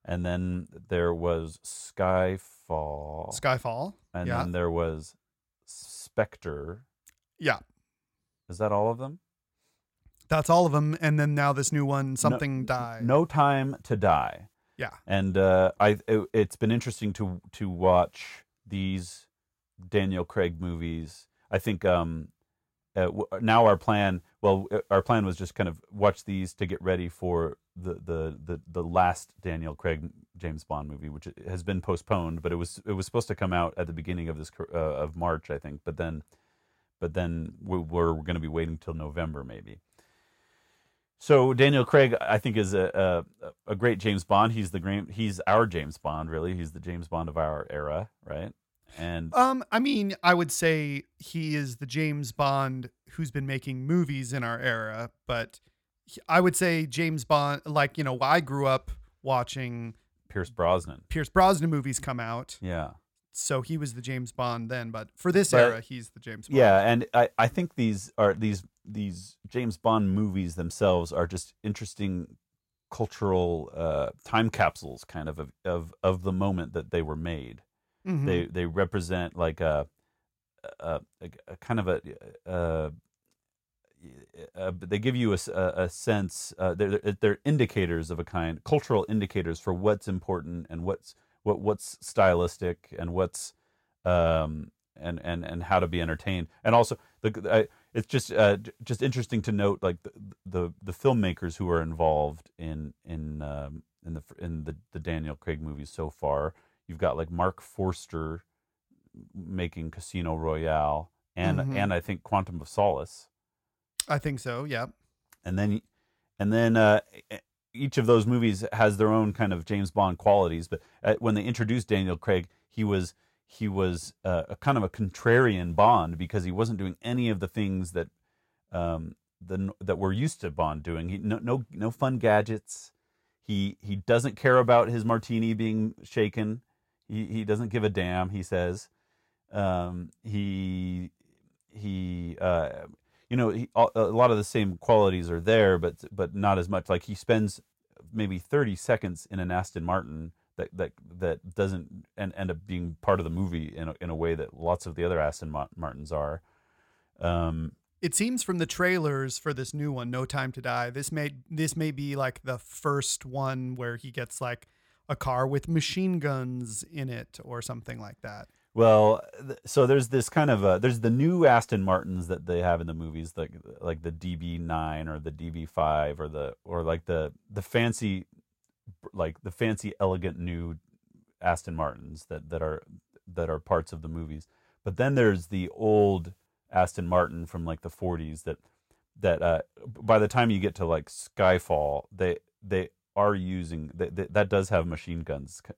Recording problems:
none

